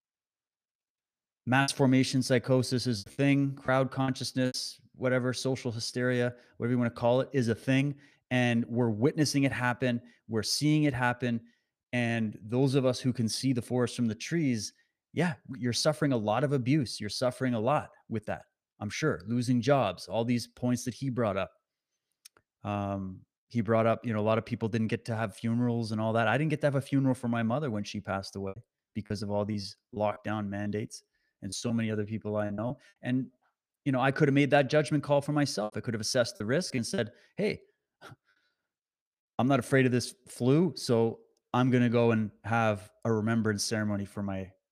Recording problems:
choppy; very; from 1.5 to 4.5 s, from 28 to 33 s and from 36 to 37 s; 11% of the speech affected

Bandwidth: 15 kHz